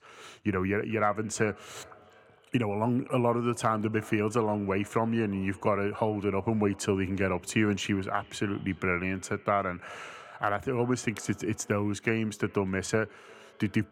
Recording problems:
echo of what is said; faint; throughout; 350 ms later, 25 dB below the speech

